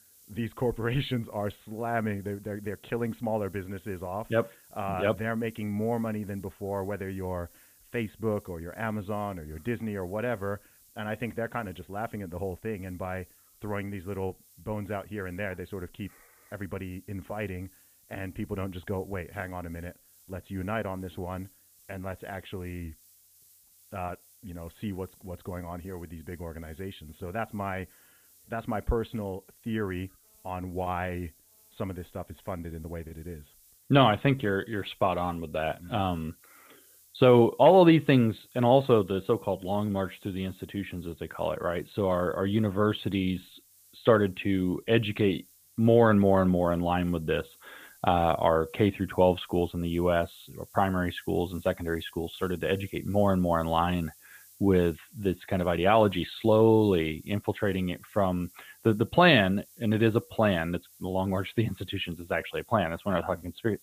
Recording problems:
high frequencies cut off; severe; nothing above 4 kHz
hiss; faint; throughout; 25 dB below the speech

